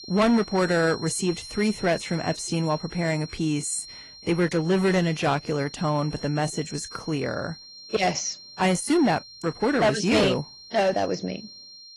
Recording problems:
distortion; slight; 5% of the sound clipped
garbled, watery; slightly
high-pitched whine; noticeable; throughout; 4 kHz, 15 dB below the speech

